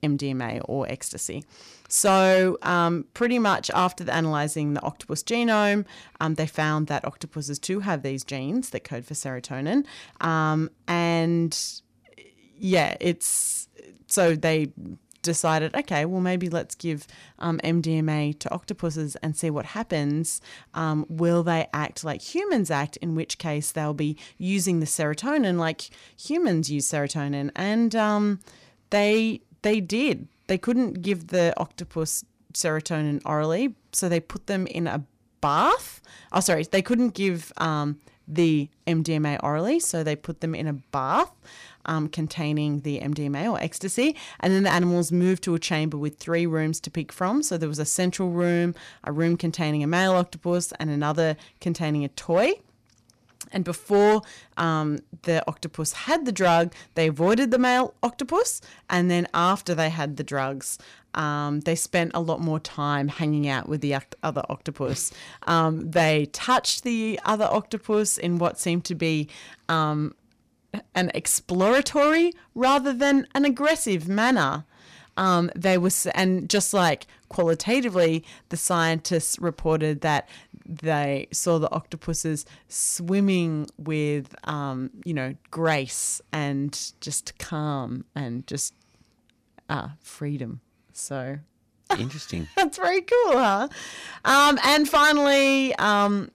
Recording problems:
distortion; slight; 2% of the sound clipped

